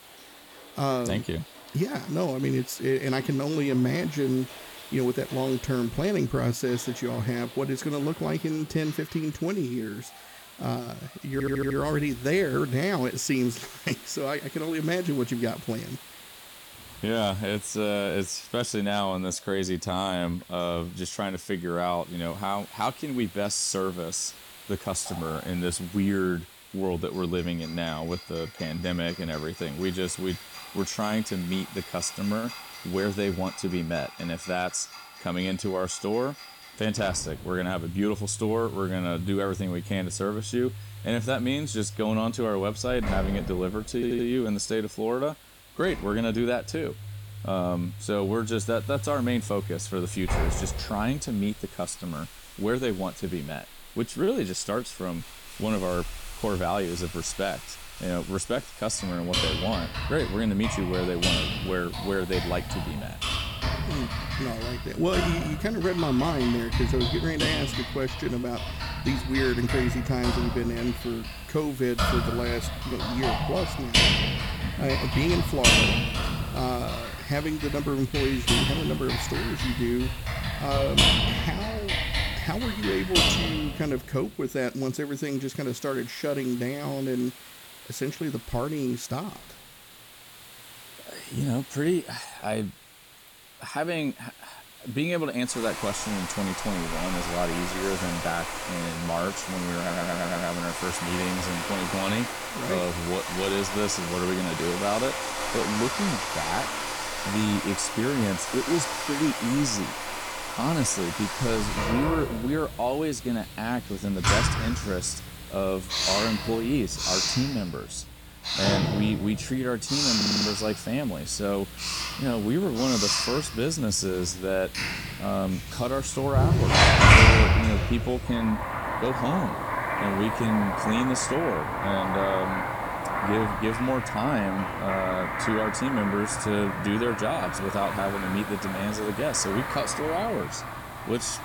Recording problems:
household noises; very loud; throughout; 1 dB above the speech
hiss; noticeable; throughout; 15 dB below the speech
audio stuttering; 4 times, first at 11 s

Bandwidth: 18.5 kHz